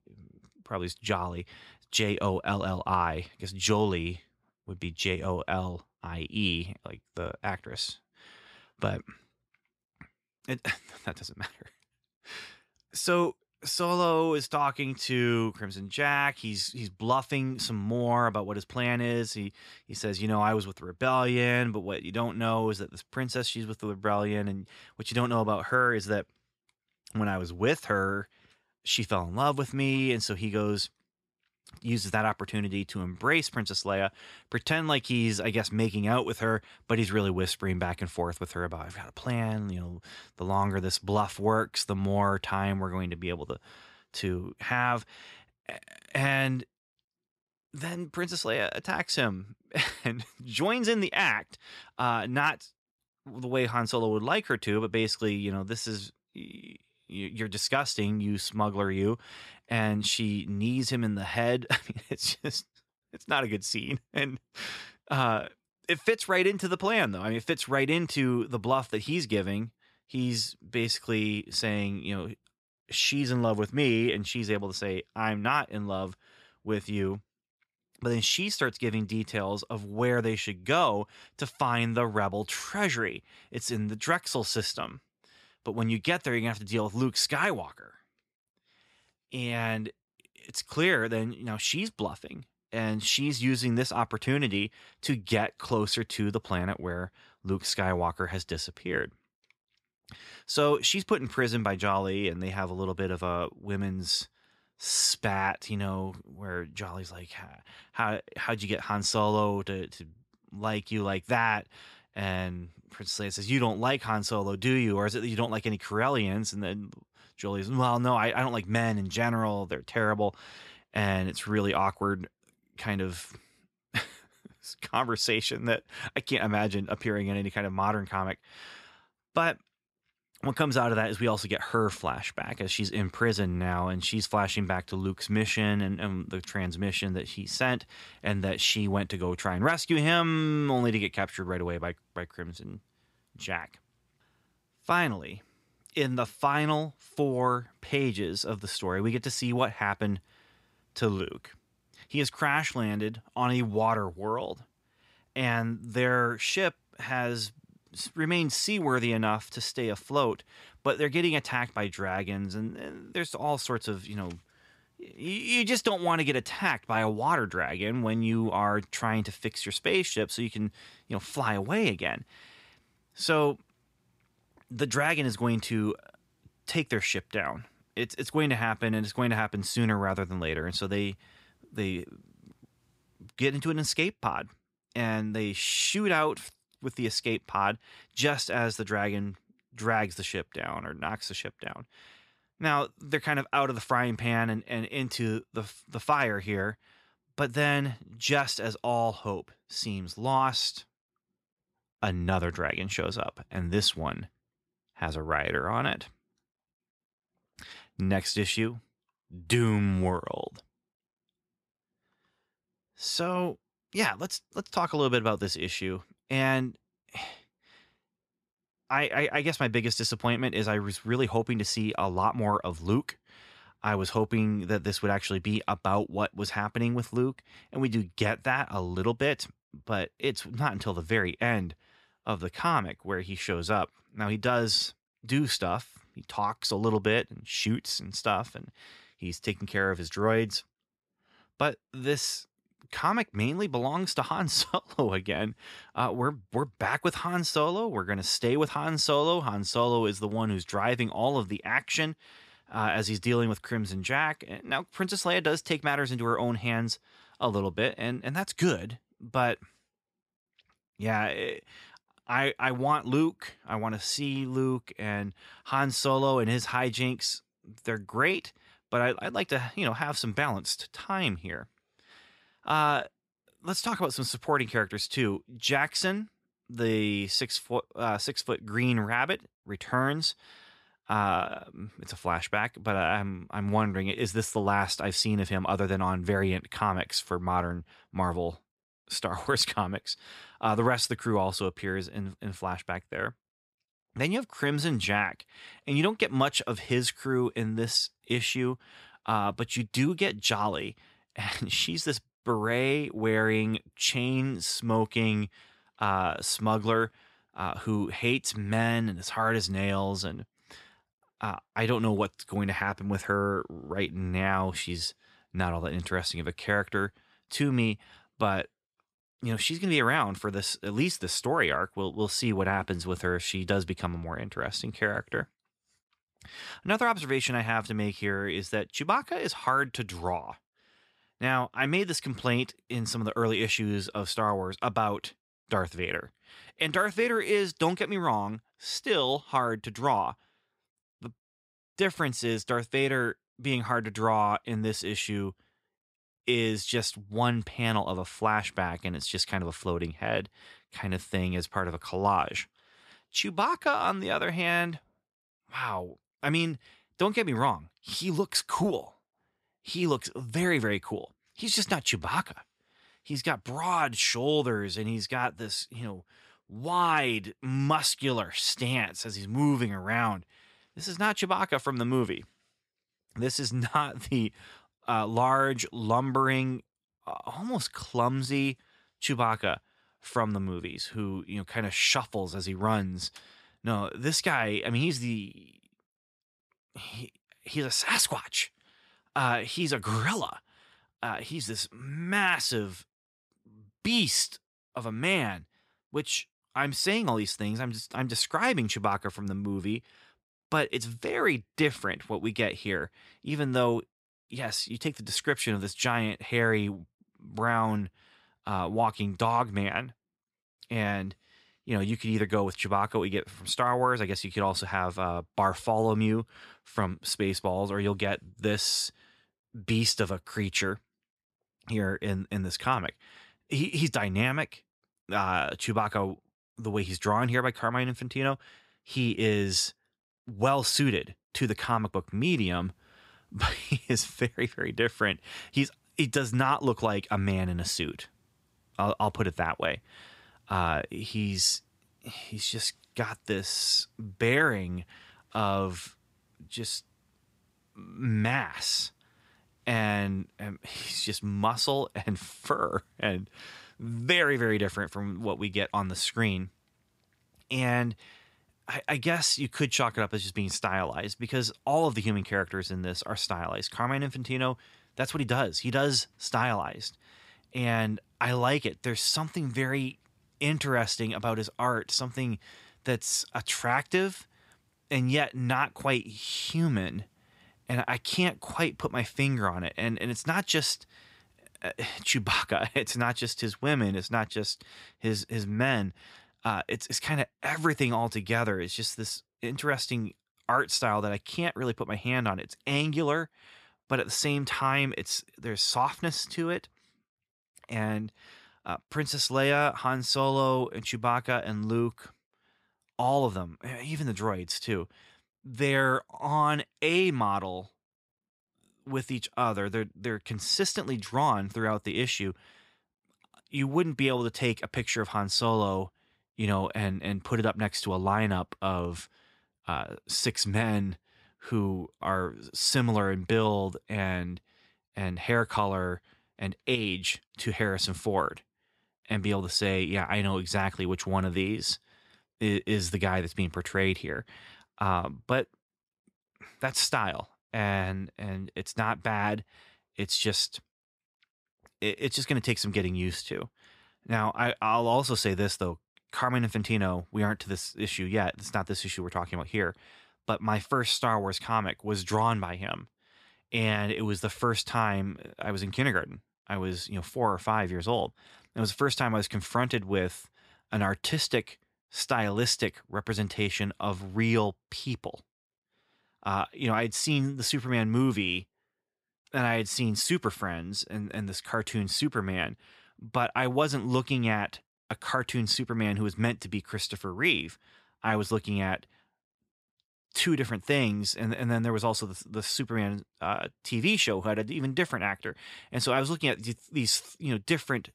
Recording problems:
none

